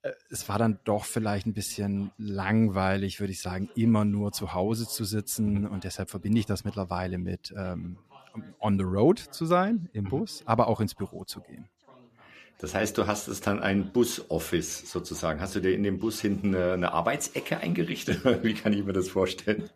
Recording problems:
background chatter; faint; throughout; 2 voices, 30 dB below the speech

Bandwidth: 14.5 kHz